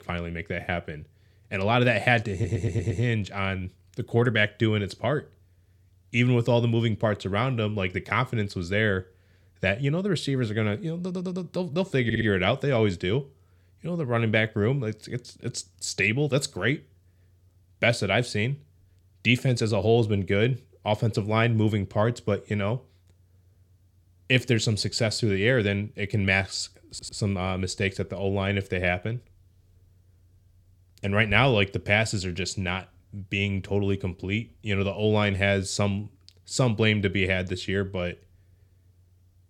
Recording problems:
audio stuttering; 4 times, first at 2.5 s

